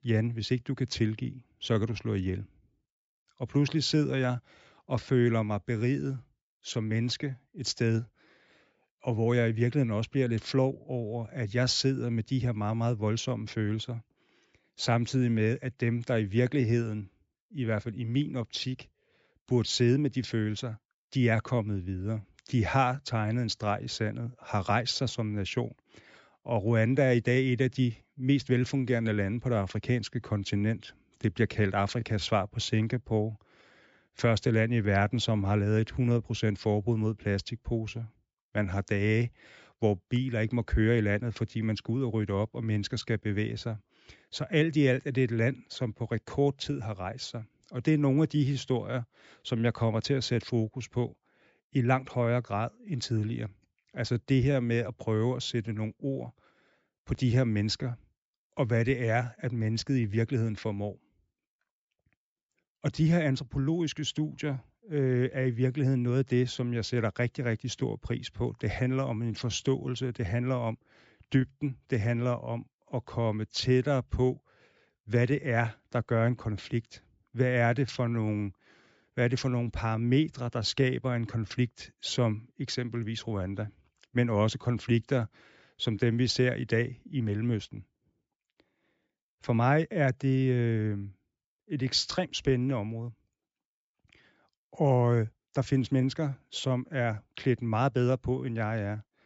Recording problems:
high frequencies cut off; noticeable; nothing above 8 kHz

